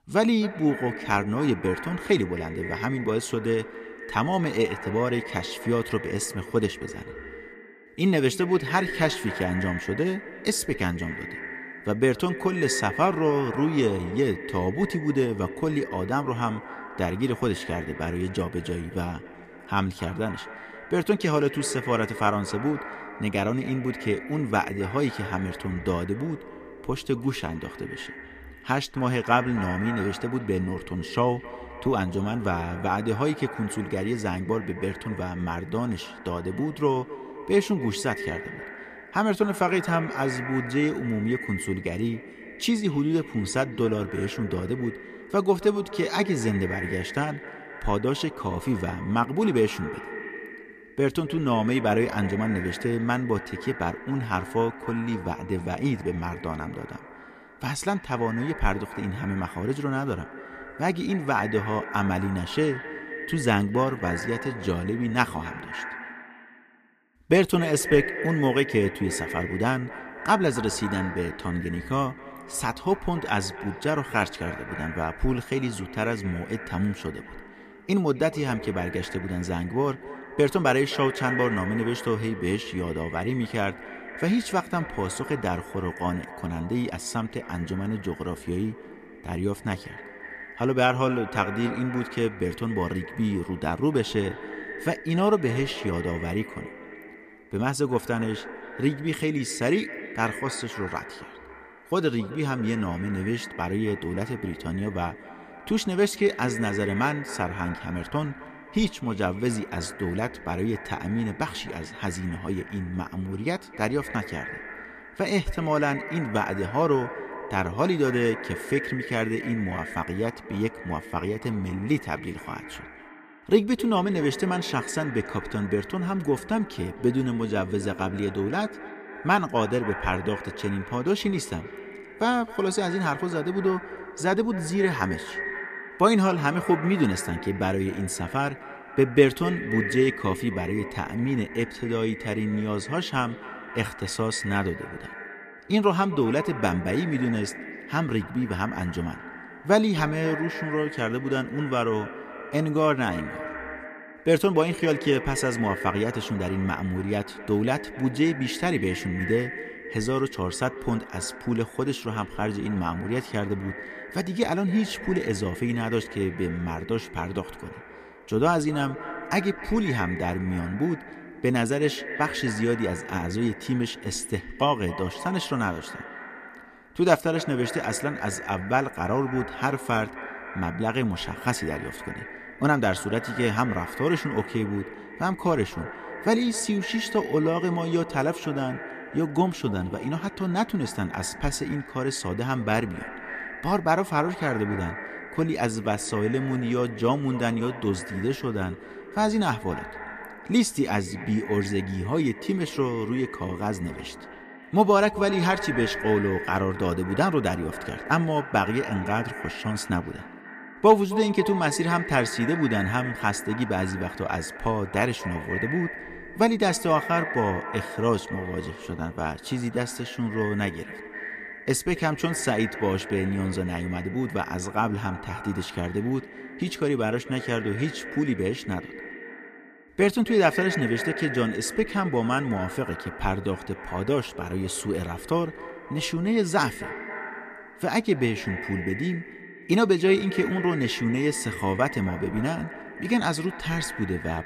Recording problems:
echo of what is said; strong; throughout; 260 ms later, 10 dB below the speech

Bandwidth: 14.5 kHz